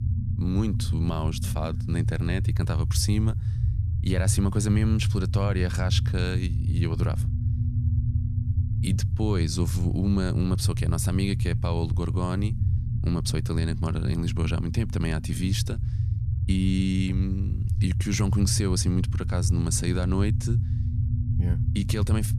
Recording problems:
low rumble; loud; throughout; 8 dB below the speech

